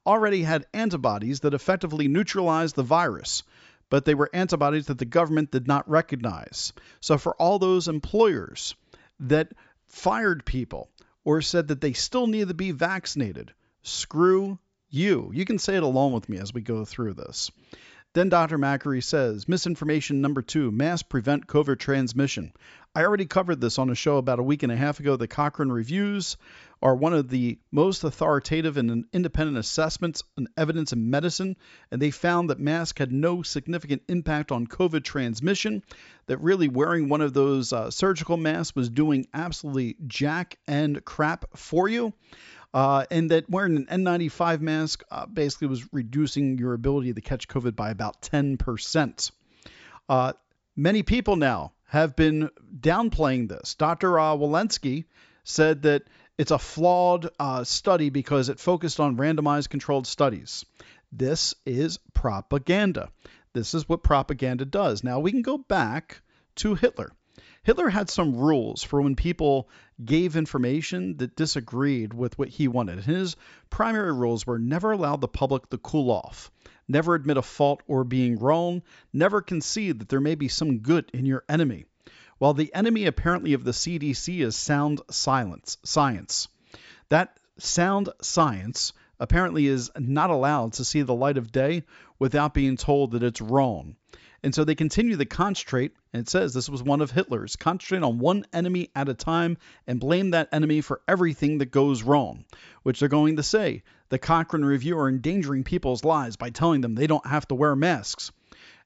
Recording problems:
high frequencies cut off; noticeable; nothing above 8 kHz

